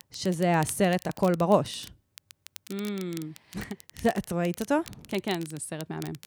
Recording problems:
crackle, like an old record; noticeable; 20 dB below the speech

